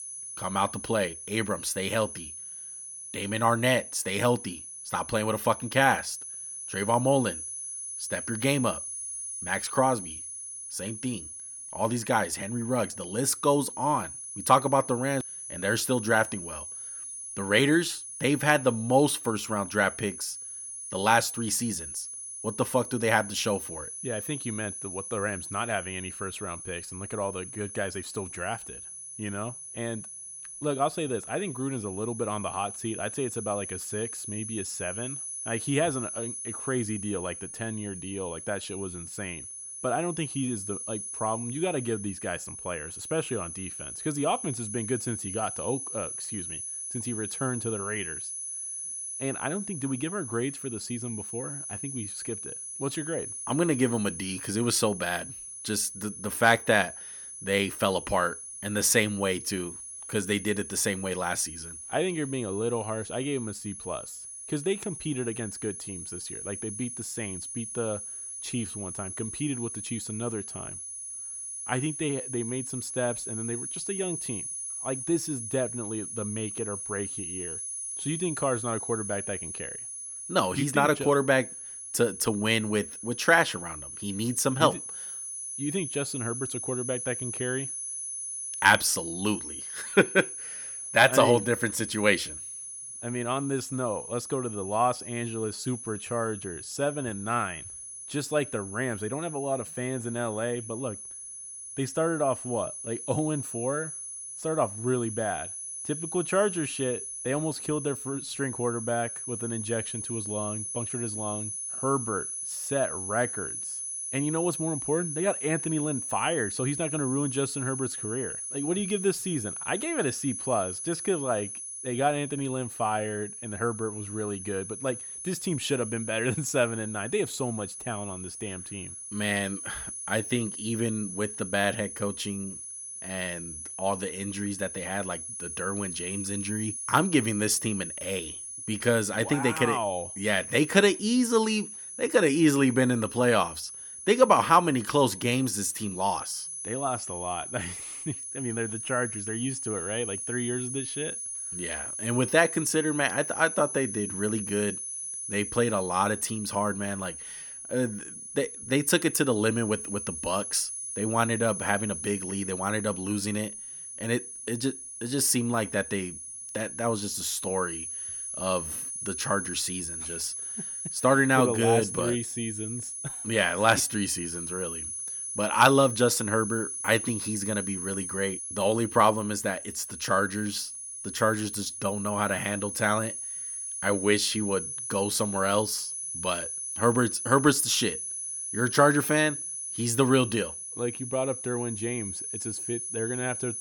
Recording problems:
high-pitched whine; loud; throughout; 10 kHz, 6 dB below the speech

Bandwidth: 18 kHz